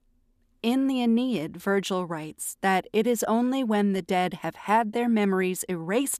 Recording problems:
none

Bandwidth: 14.5 kHz